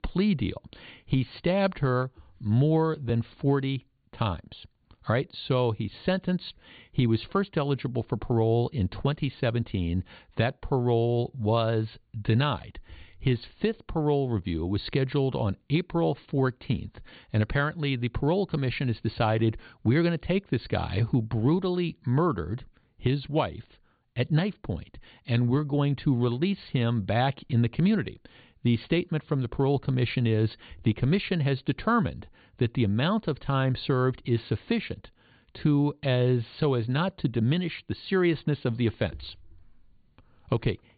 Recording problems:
high frequencies cut off; severe; nothing above 4.5 kHz

